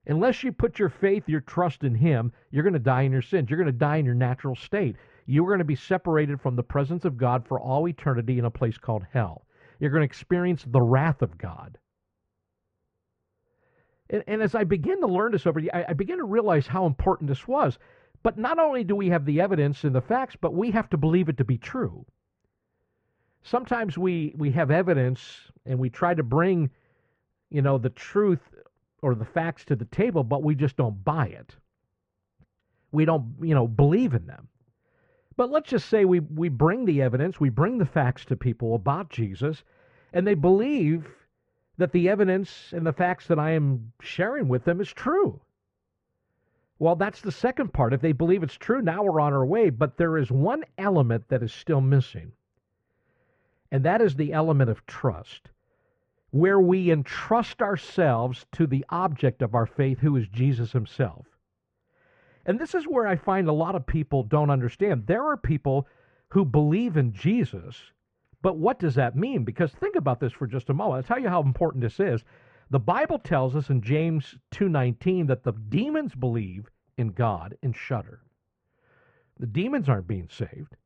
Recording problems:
muffled; very; fading above 1.5 kHz

